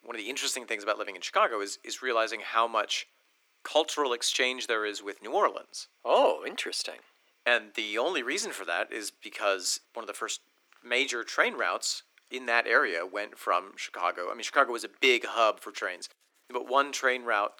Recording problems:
thin; very; fading below 300 Hz

